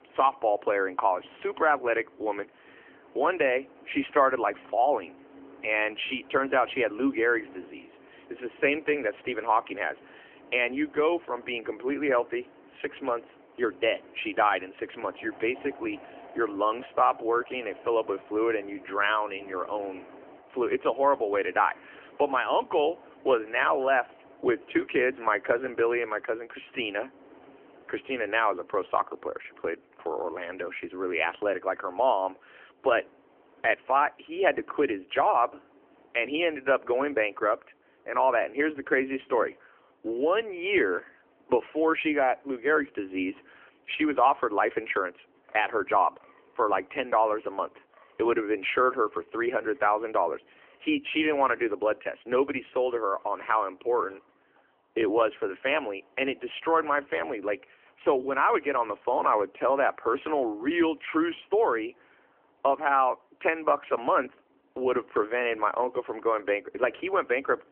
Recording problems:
phone-call audio; nothing above 3 kHz
wind in the background; faint; throughout; 25 dB below the speech

